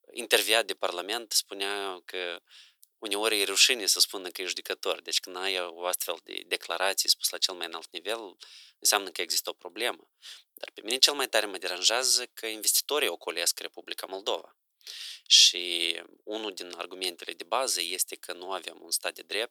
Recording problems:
thin; very; fading below 400 Hz

